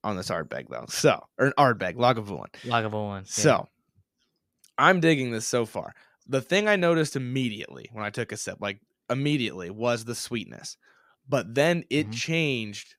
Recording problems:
none

